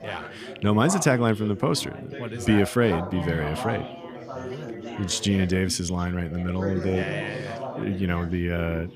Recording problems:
background chatter; noticeable; throughout; 4 voices, 10 dB below the speech

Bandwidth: 15 kHz